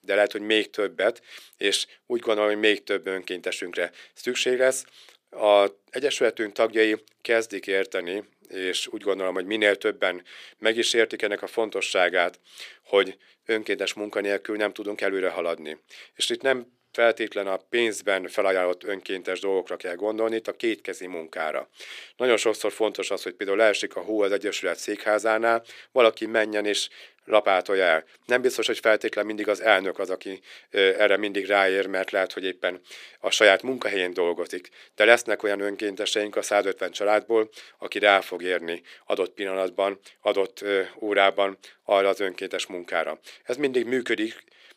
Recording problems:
thin; somewhat; fading below 400 Hz

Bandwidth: 15 kHz